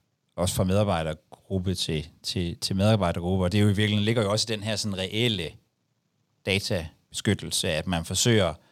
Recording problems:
none

